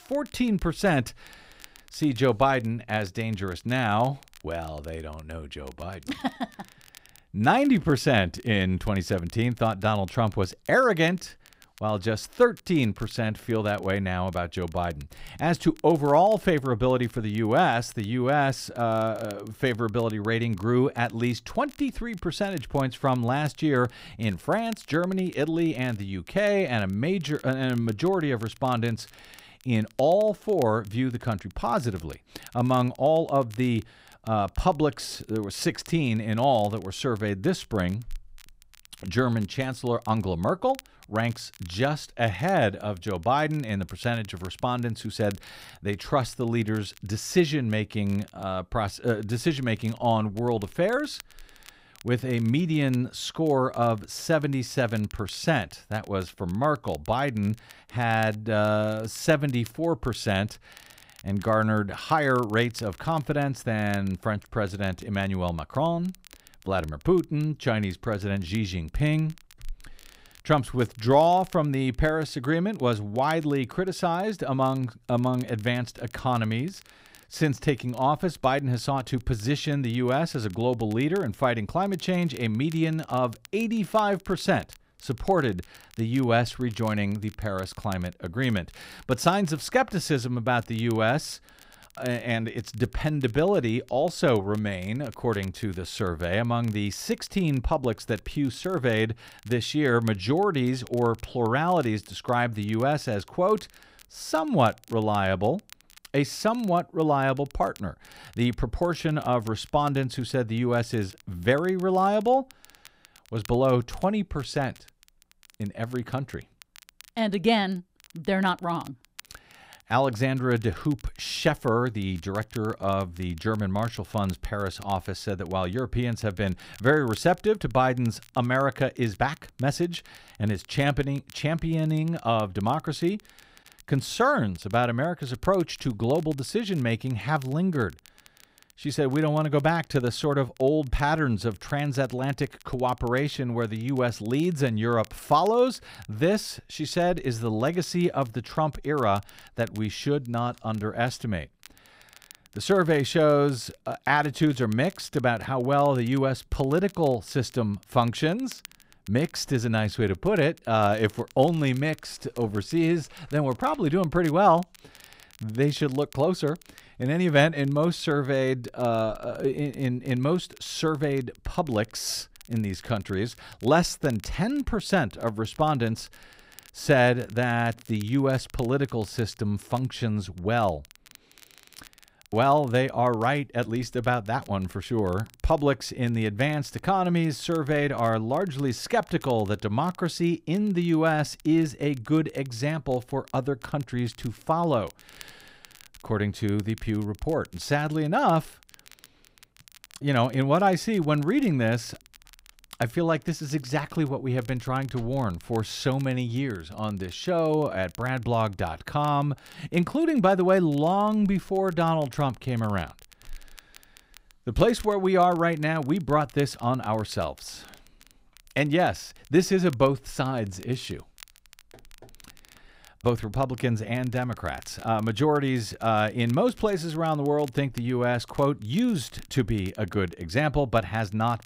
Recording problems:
crackle, like an old record; faint; 25 dB below the speech

